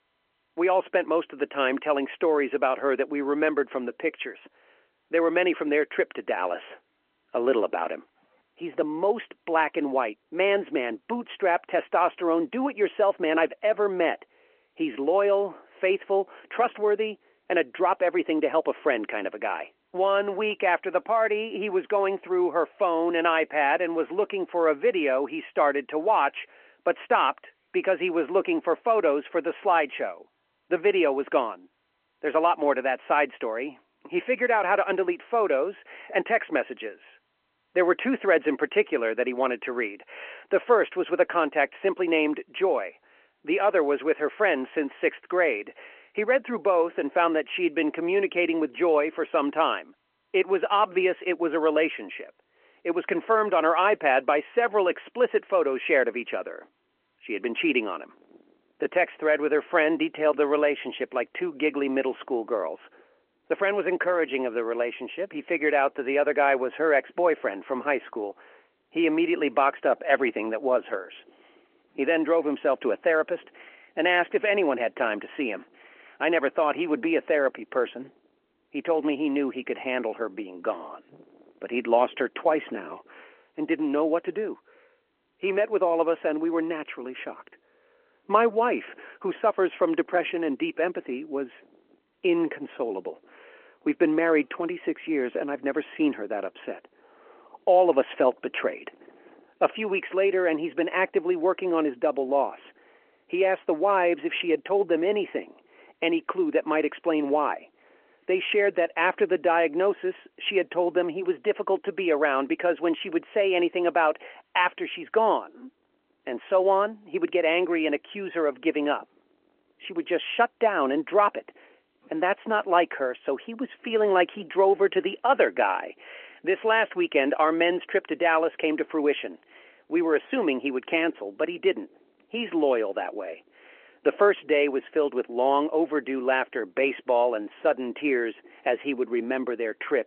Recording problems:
phone-call audio

